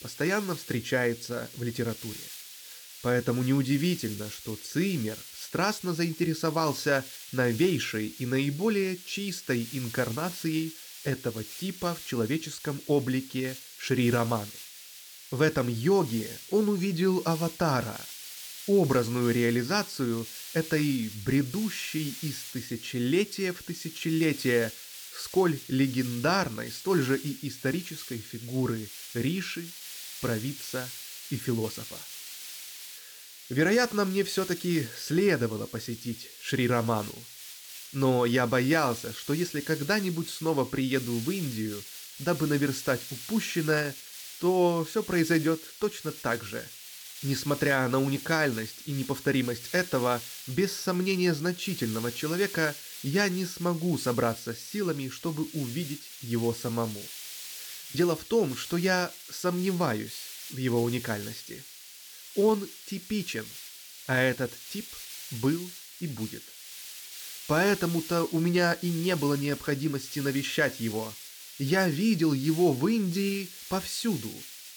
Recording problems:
hiss; noticeable; throughout; 10 dB below the speech

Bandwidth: 19 kHz